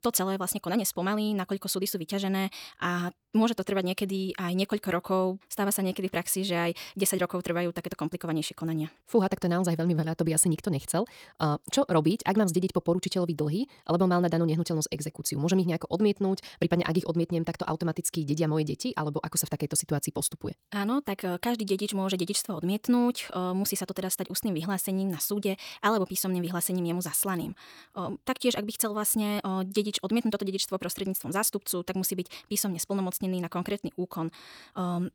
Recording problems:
wrong speed, natural pitch; too fast; 1.5 times normal speed

